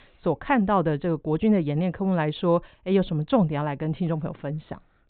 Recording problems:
high frequencies cut off; severe; nothing above 4 kHz

